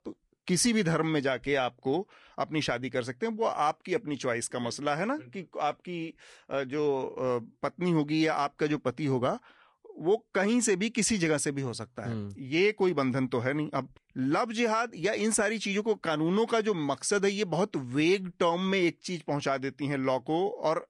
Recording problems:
garbled, watery; slightly; nothing above 10.5 kHz

